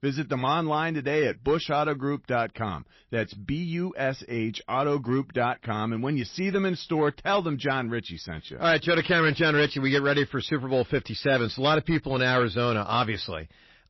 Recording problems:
distortion; slight; 4% of the sound clipped
garbled, watery; slightly; nothing above 5.5 kHz

